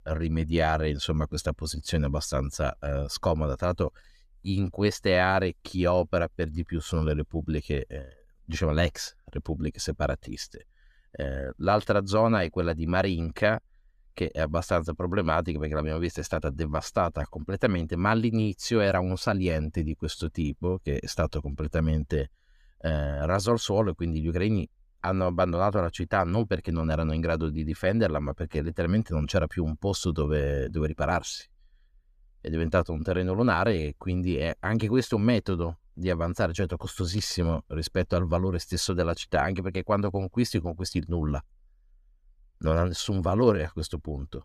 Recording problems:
none

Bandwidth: 14.5 kHz